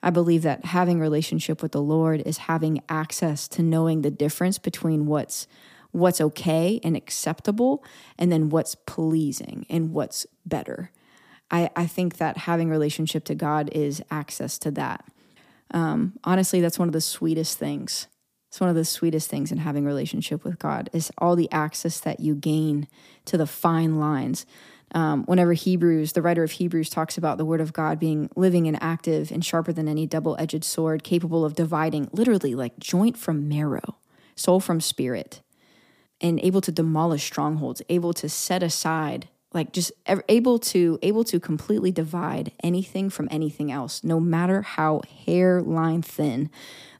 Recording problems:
none

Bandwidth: 15 kHz